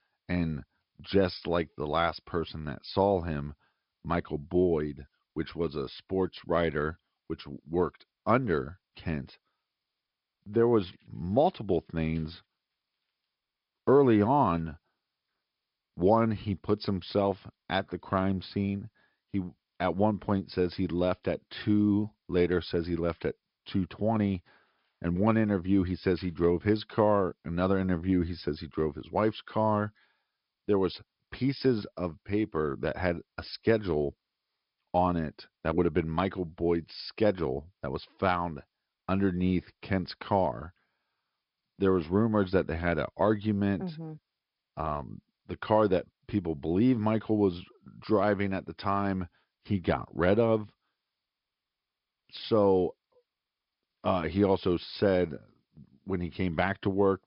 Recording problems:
high frequencies cut off; noticeable; nothing above 5 kHz
garbled, watery; slightly

